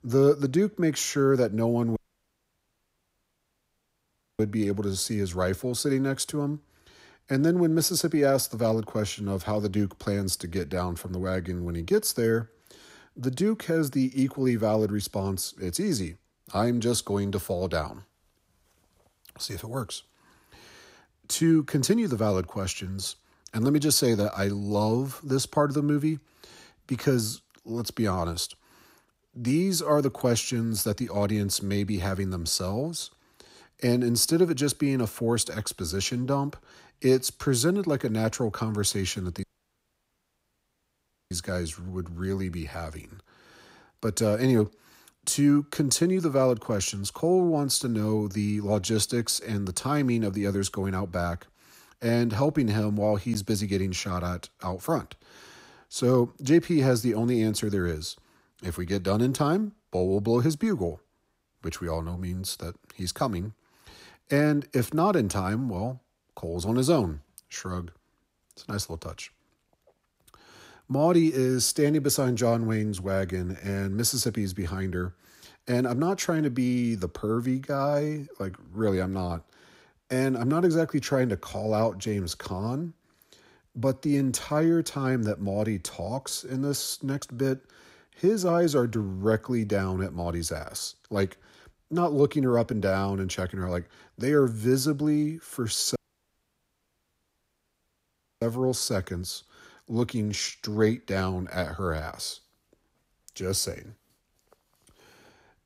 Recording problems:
audio cutting out; at 2 s for 2.5 s, at 39 s for 2 s and at 1:36 for 2.5 s

